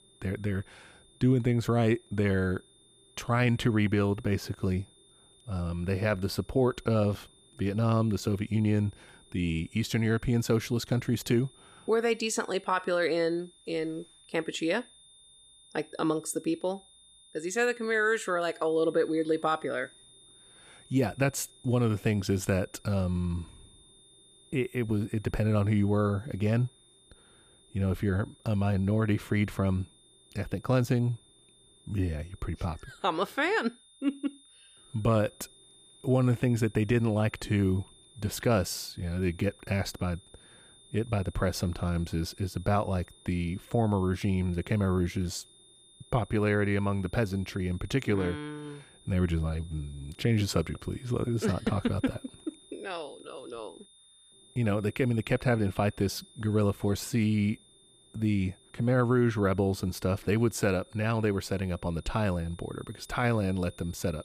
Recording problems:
high-pitched whine; faint; throughout; 3.5 kHz, 25 dB below the speech

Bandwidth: 15 kHz